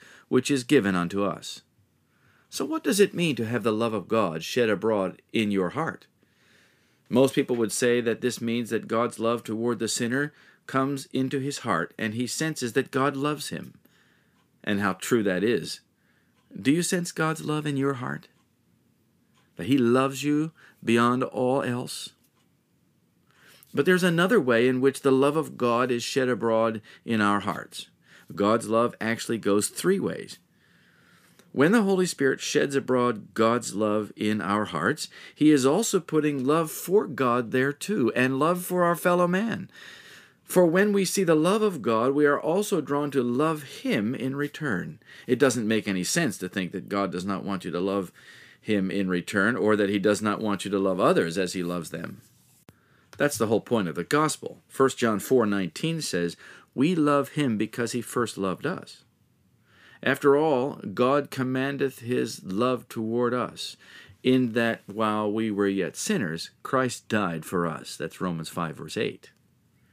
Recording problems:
none

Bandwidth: 15 kHz